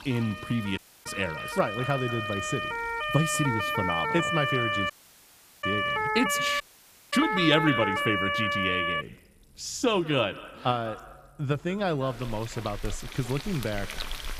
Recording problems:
echo of what is said; faint; throughout; 190 ms later, 20 dB below the speech
household noises; noticeable; throughout; 15 dB below the speech
siren; loud; until 9 s; peak 3 dB above the speech
audio cutting out; at 1 s, at 5 s for 0.5 s and at 6.5 s for 0.5 s

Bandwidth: 15 kHz